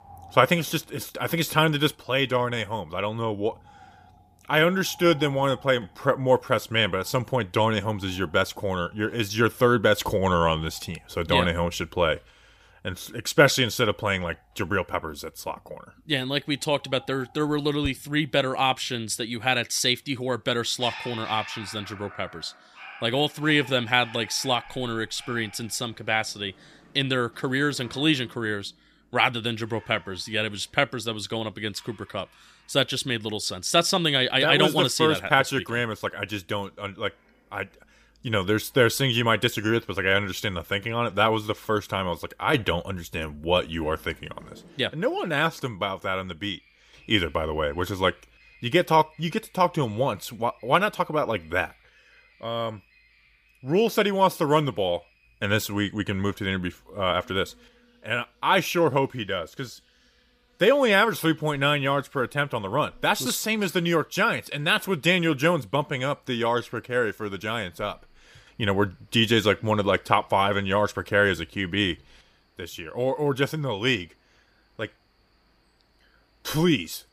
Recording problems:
animal sounds; faint; throughout; 25 dB below the speech

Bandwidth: 15 kHz